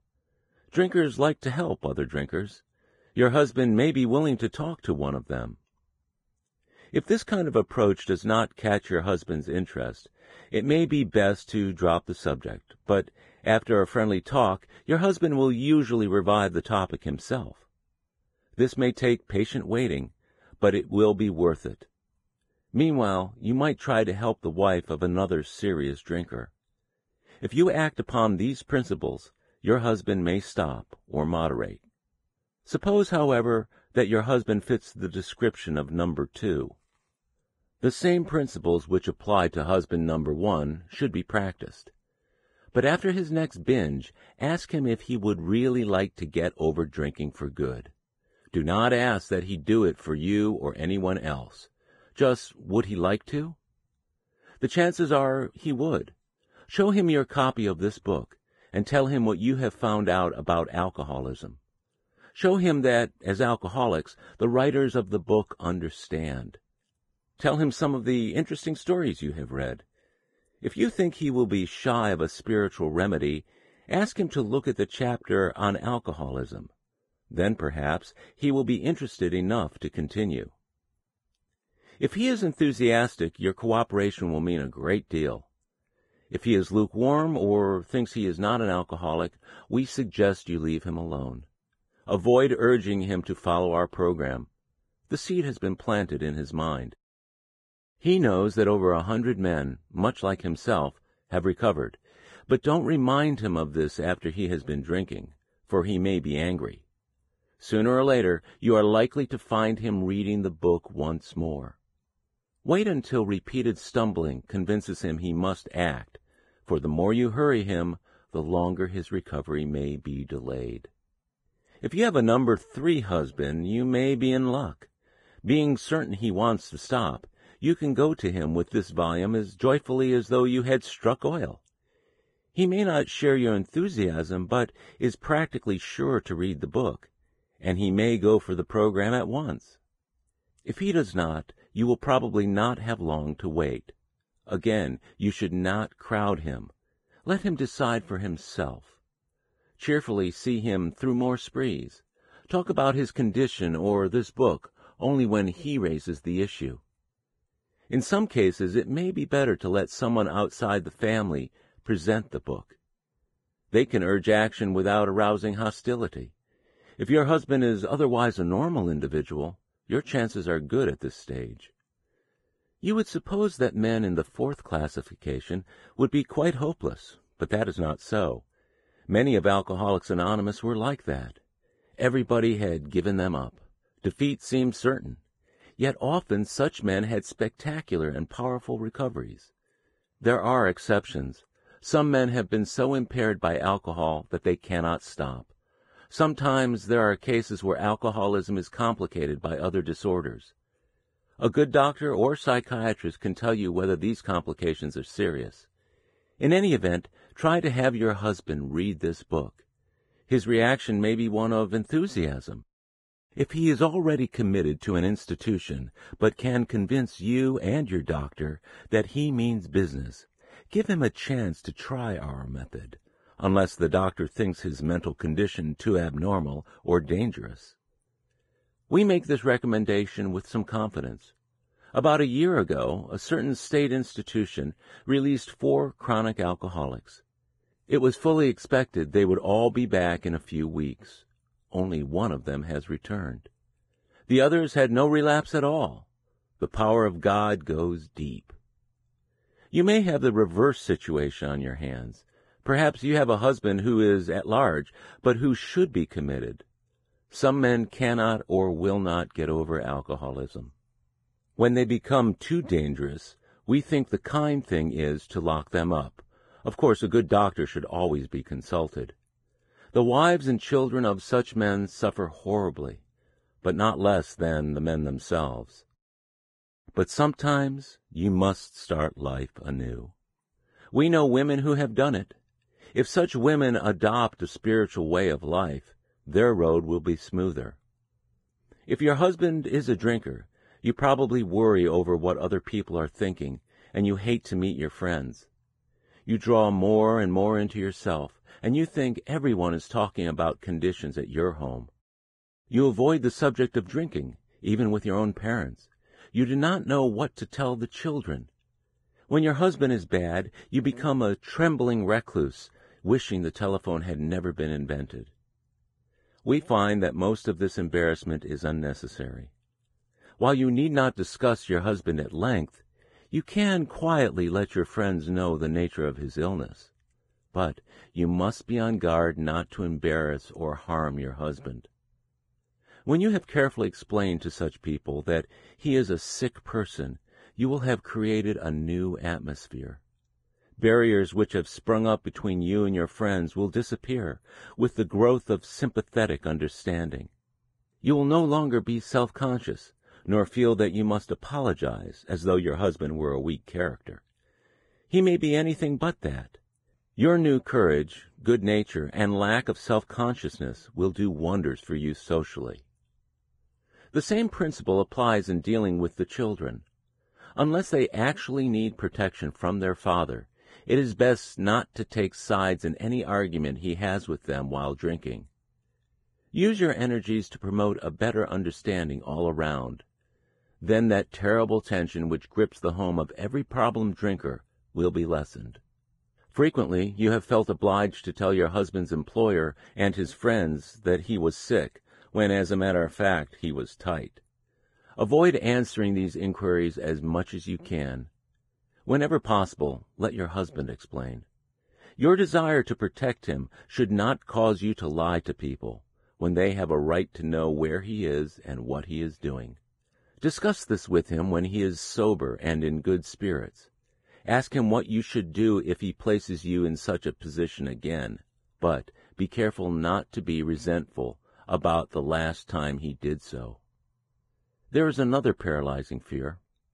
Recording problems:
garbled, watery; badly; nothing above 10 kHz
muffled; slightly; fading above 2.5 kHz

